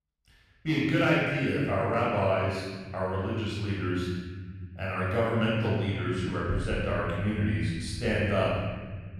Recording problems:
room echo; strong; dies away in 1.8 s
off-mic speech; far

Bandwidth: 15 kHz